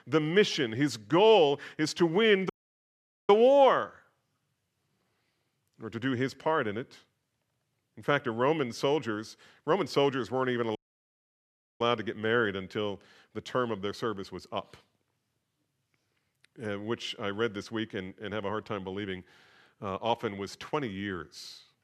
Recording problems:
audio cutting out; at 2.5 s for 1 s and at 11 s for 1 s

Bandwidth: 13.5 kHz